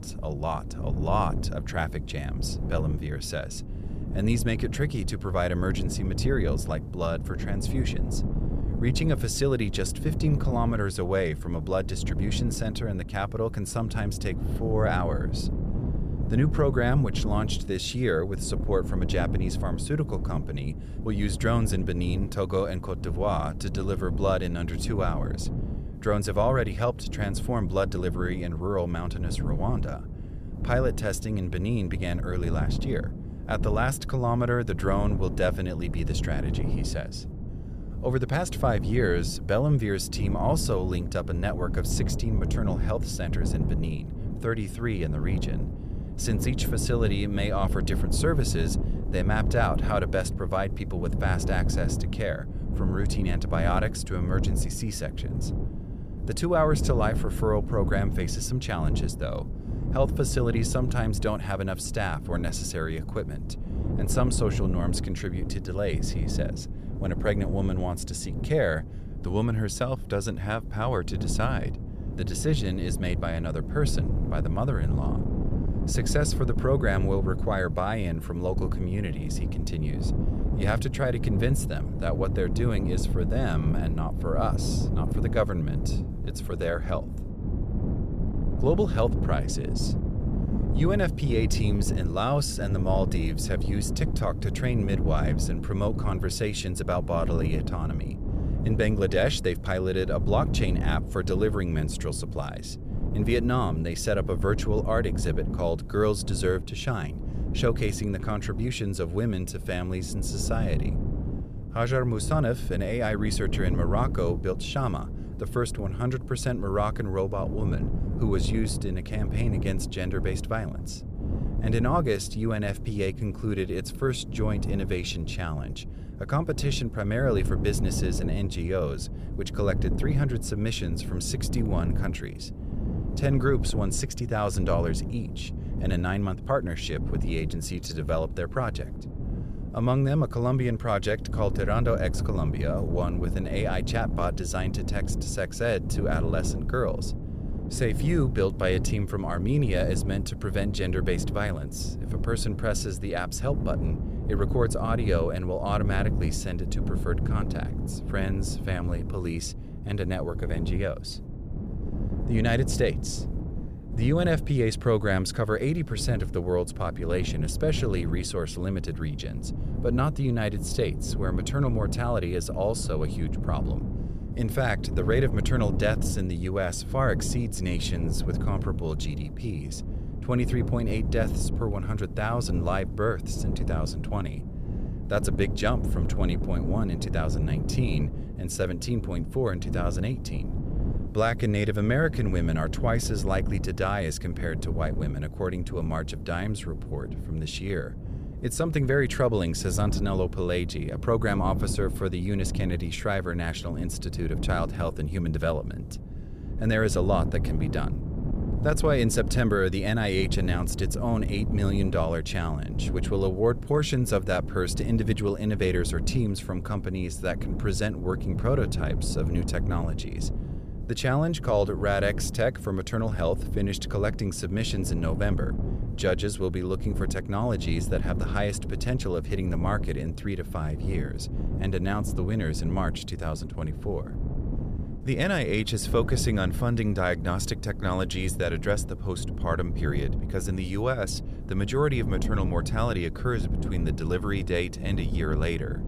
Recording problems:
wind noise on the microphone; occasional gusts; 10 dB below the speech

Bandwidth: 14.5 kHz